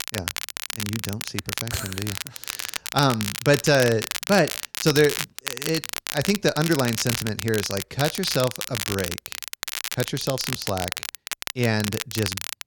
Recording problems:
crackle, like an old record; loud; 5 dB below the speech

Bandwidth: 17.5 kHz